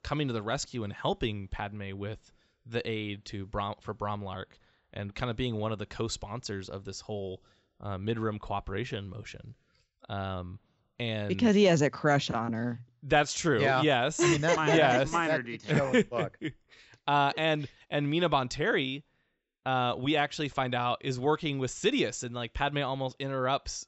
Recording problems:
high frequencies cut off; noticeable; nothing above 7.5 kHz

